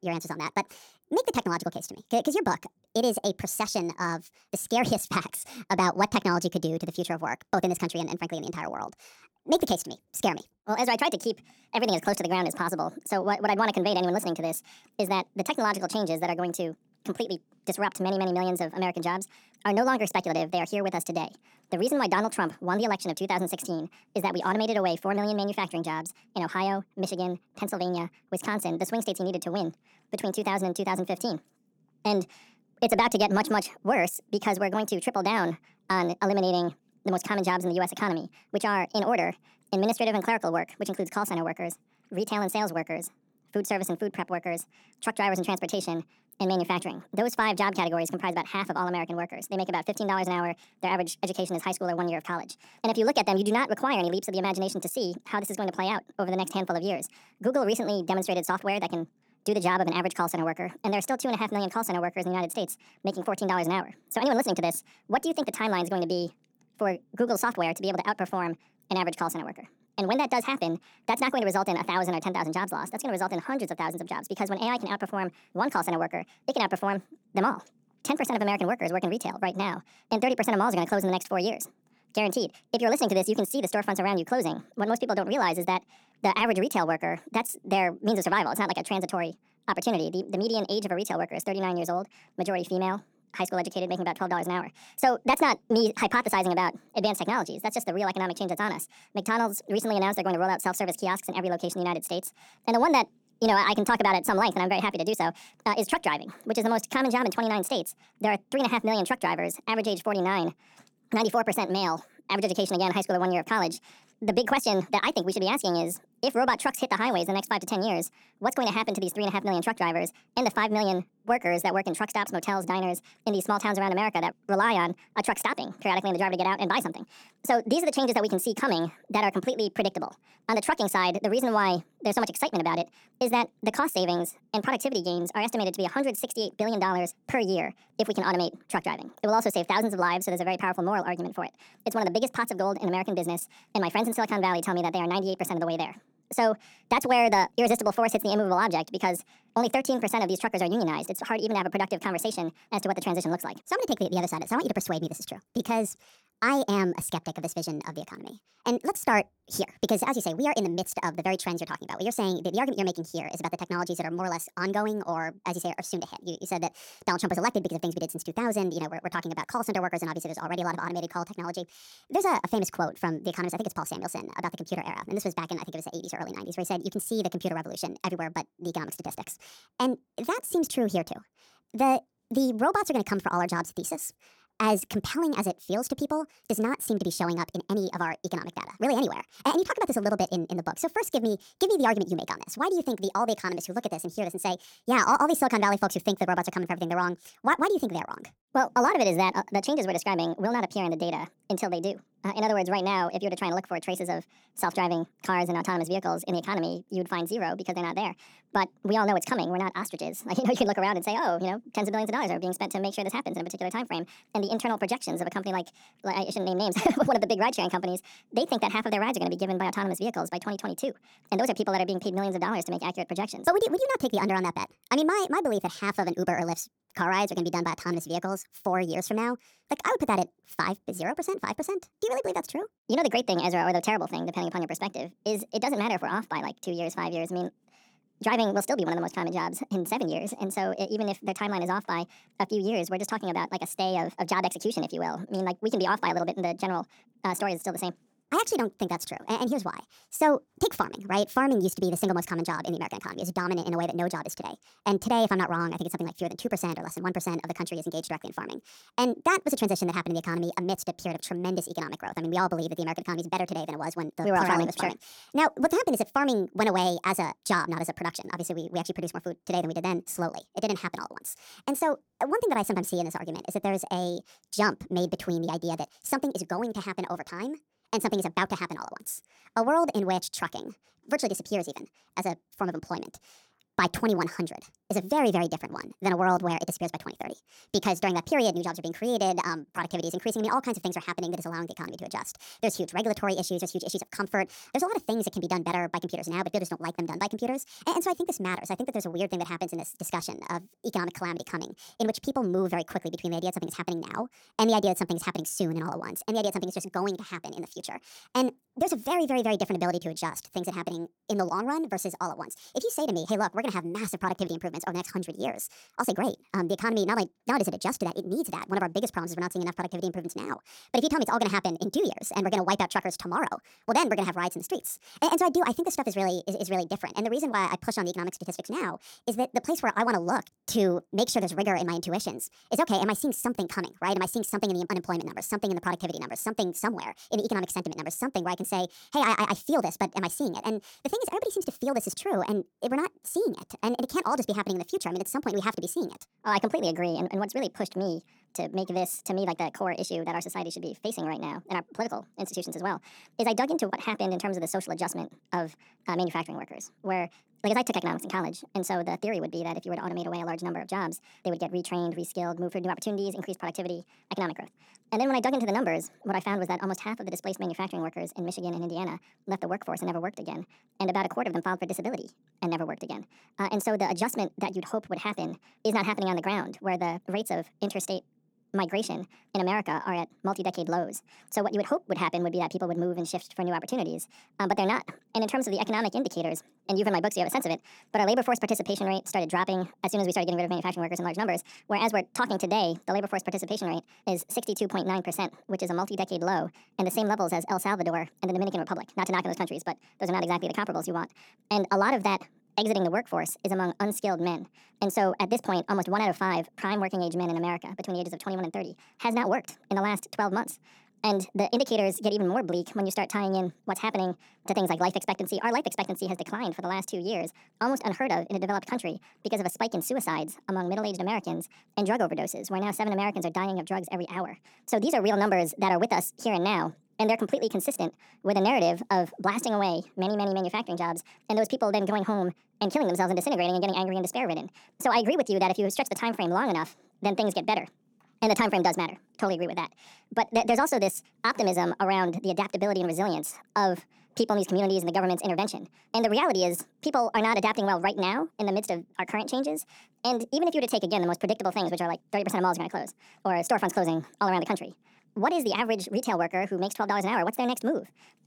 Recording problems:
wrong speed and pitch; too fast and too high; 1.6 times normal speed

